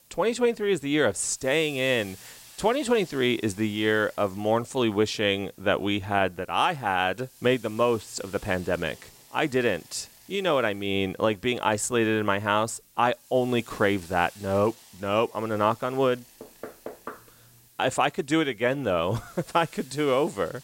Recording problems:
hiss; faint; throughout; 25 dB below the speech

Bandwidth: 16 kHz